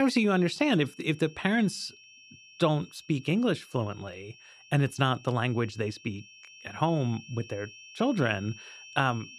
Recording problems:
high-pitched whine; faint; throughout; 2.5 kHz, 20 dB below the speech
abrupt cut into speech; at the start

